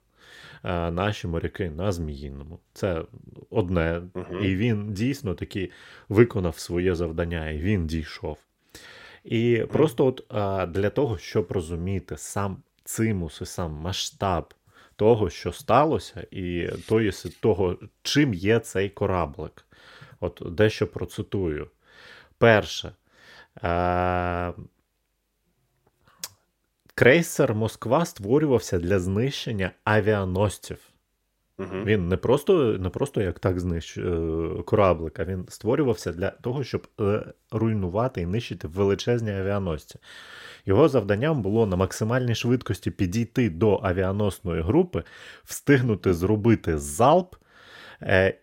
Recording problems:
none

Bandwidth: 16 kHz